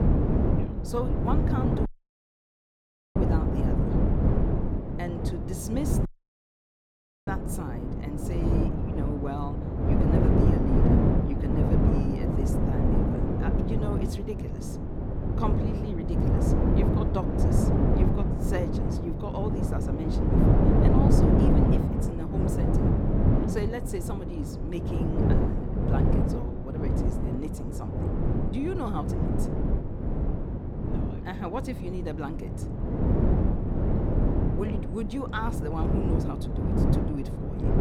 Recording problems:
wind noise on the microphone; heavy; 4 dB above the speech
audio cutting out; at 2 s for 1.5 s and at 6 s for 1 s

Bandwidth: 17 kHz